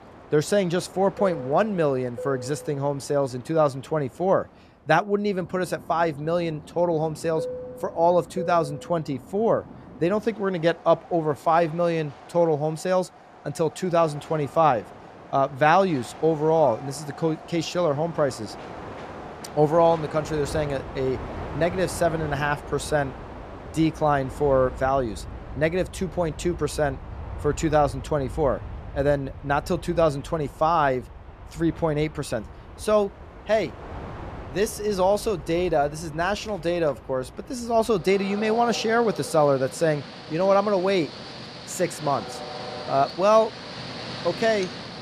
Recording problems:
train or aircraft noise; noticeable; throughout; 15 dB below the speech

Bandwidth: 14 kHz